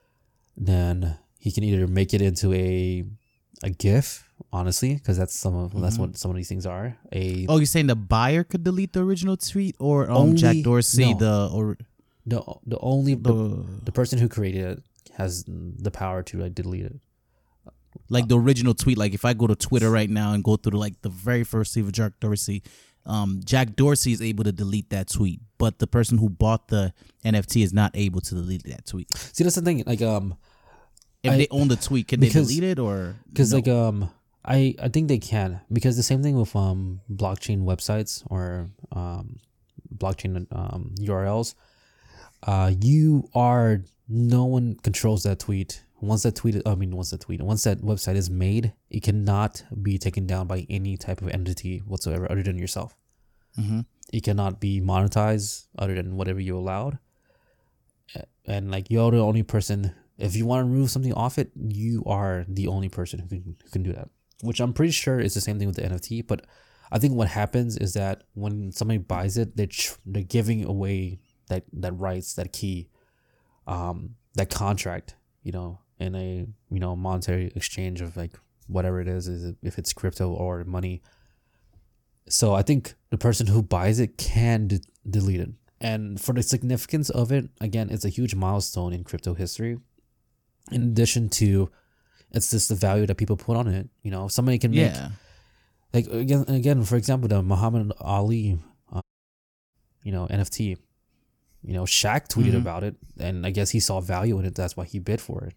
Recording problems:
audio cutting out; at 1:39 for 0.5 s

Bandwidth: 18 kHz